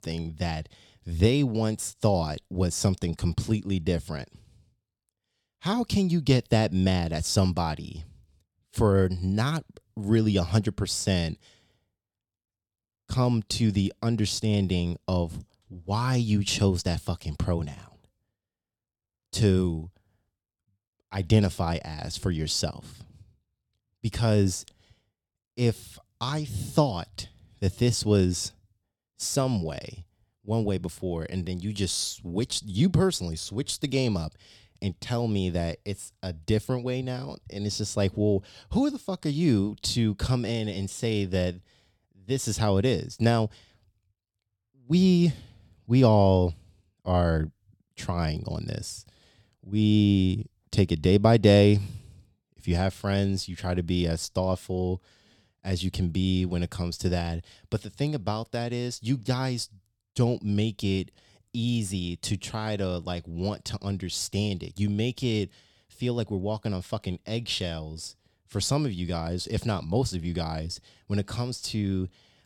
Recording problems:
none

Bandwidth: 17.5 kHz